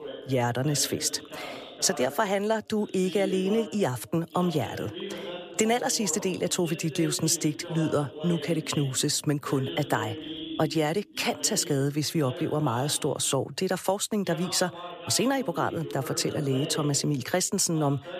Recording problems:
voice in the background; noticeable; throughout; 10 dB below the speech

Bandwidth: 14.5 kHz